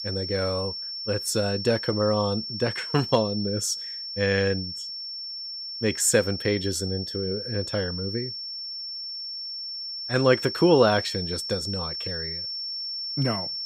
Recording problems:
high-pitched whine; loud; throughout; 5.5 kHz, 6 dB below the speech

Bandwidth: 15.5 kHz